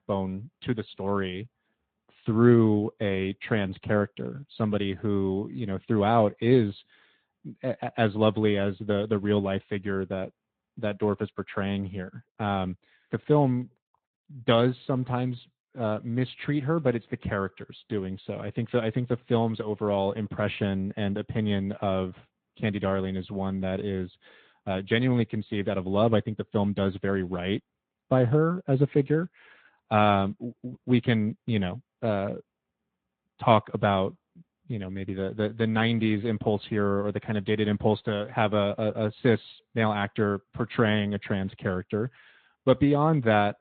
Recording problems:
high frequencies cut off; severe; nothing above 3.5 kHz
garbled, watery; slightly

